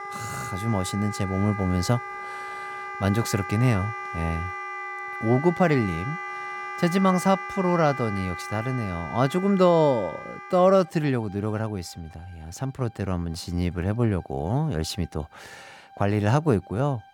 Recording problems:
background music; loud; throughout; 9 dB below the speech

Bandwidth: 18 kHz